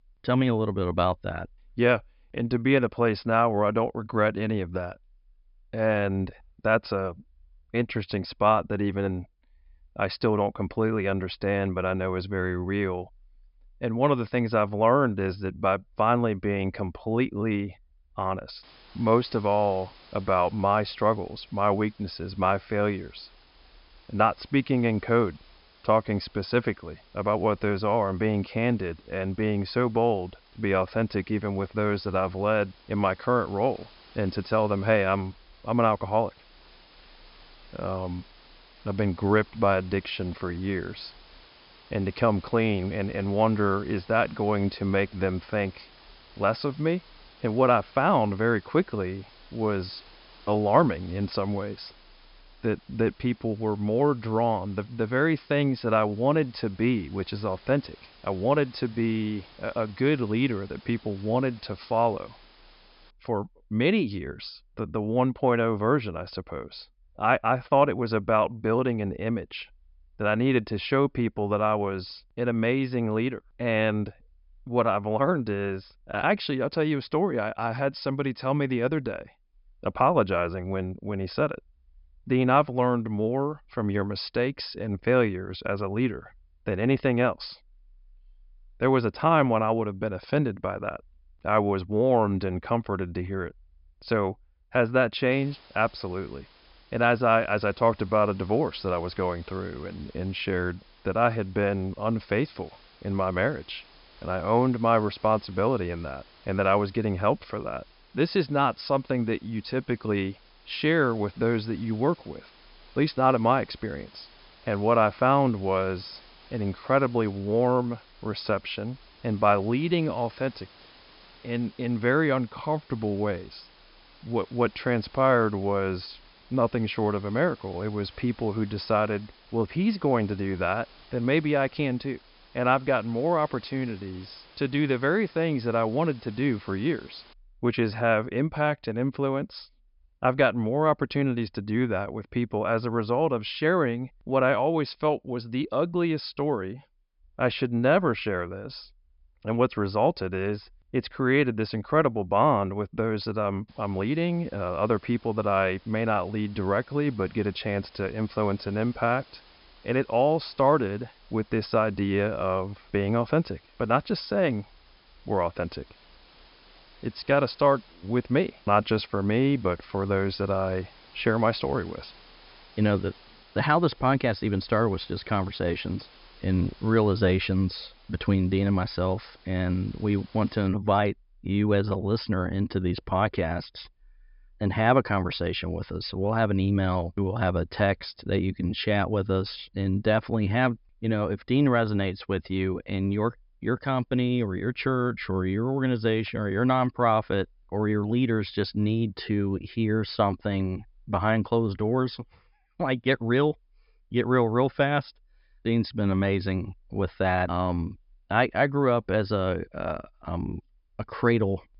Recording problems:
high frequencies cut off; noticeable; nothing above 5.5 kHz
hiss; faint; from 19 s to 1:03, from 1:35 to 2:17 and from 2:34 to 3:01; 25 dB below the speech

